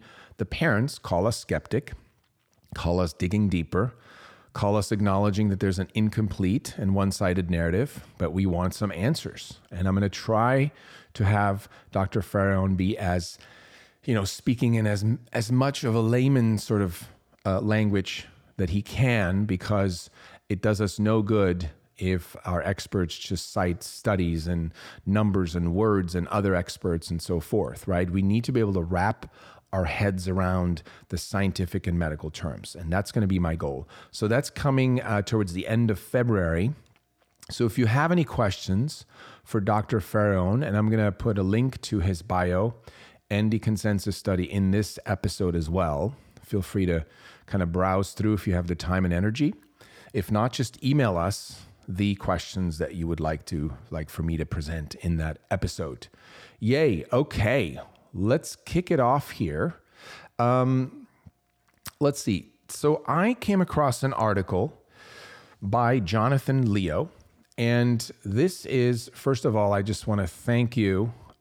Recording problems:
none

